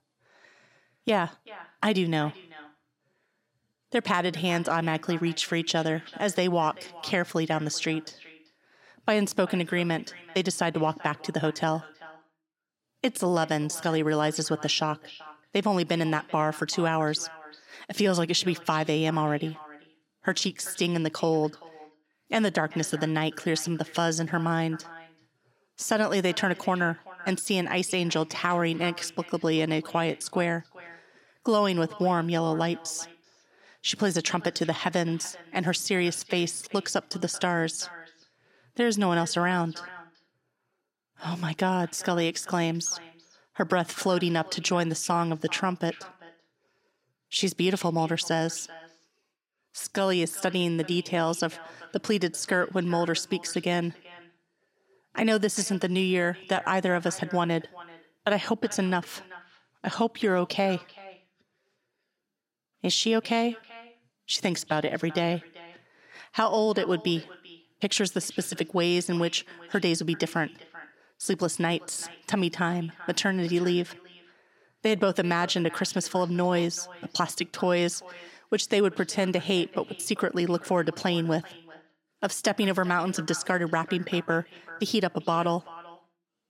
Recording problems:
echo of what is said; faint; throughout; 390 ms later, 20 dB below the speech

